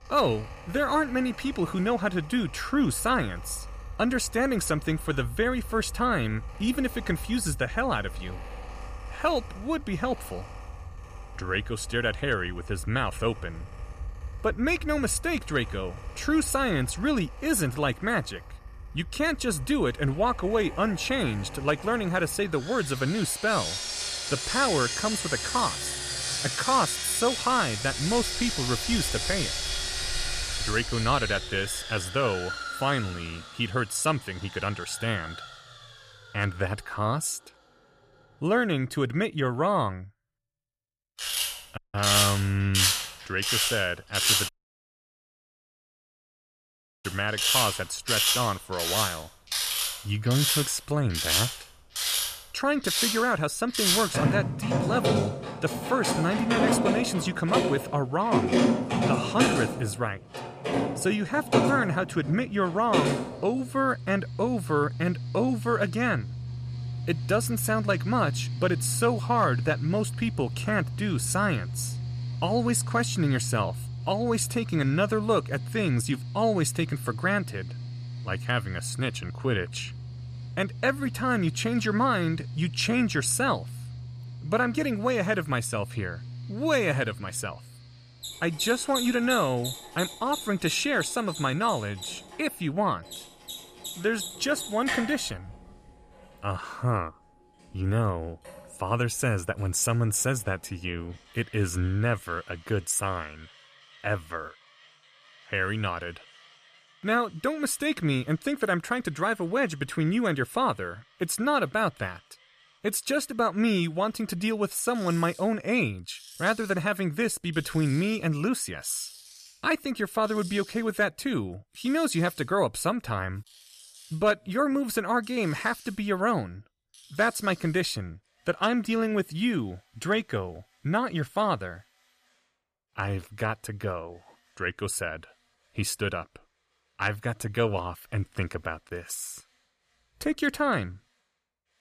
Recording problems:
machinery noise; loud; throughout; 3 dB below the speech
audio cutting out; at 42 s and at 44 s for 2.5 s

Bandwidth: 14.5 kHz